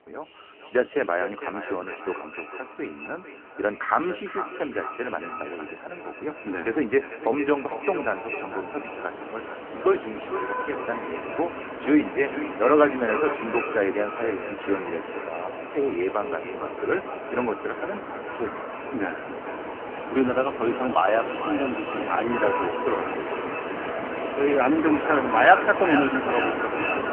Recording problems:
phone-call audio; poor line; nothing above 3 kHz
echo of what is said; strong; throughout; 450 ms later, 9 dB below the speech
traffic noise; loud; throughout; 7 dB below the speech

